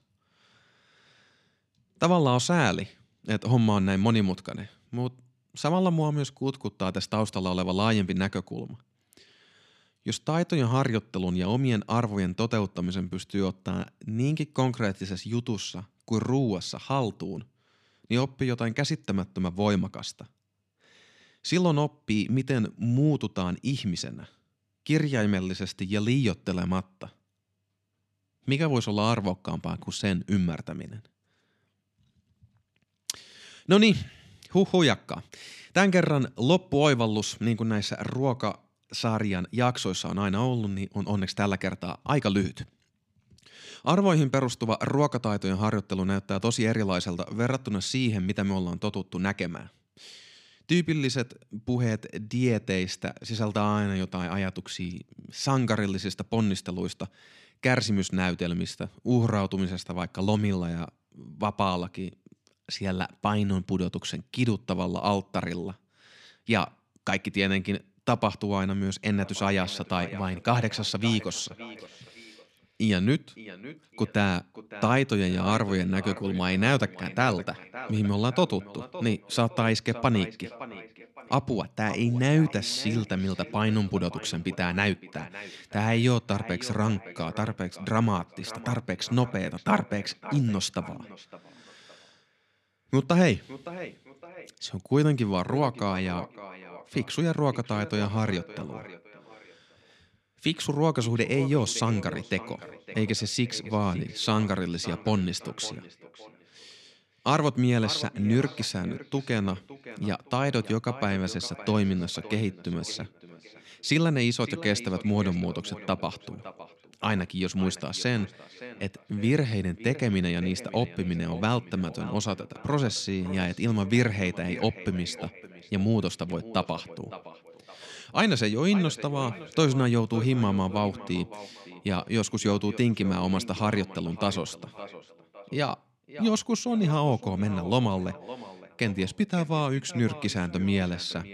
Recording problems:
echo of what is said; noticeable; from 1:09 on; 560 ms later, 15 dB below the speech

